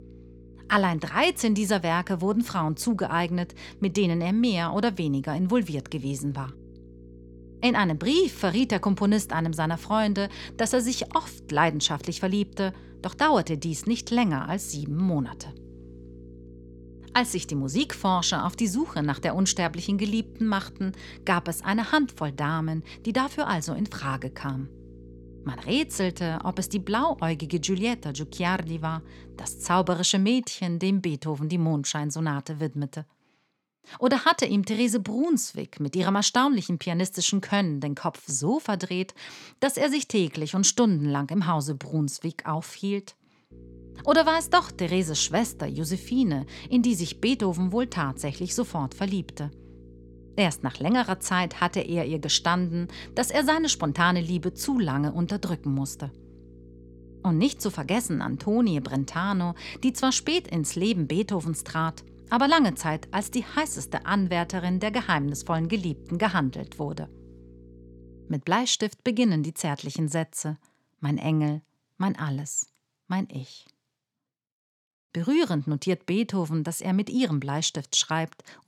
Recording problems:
electrical hum; faint; until 30 s and from 44 s to 1:08; 60 Hz, 25 dB below the speech

